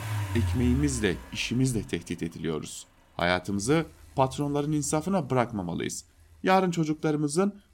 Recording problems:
traffic noise; loud; throughout; 7 dB below the speech

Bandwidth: 16.5 kHz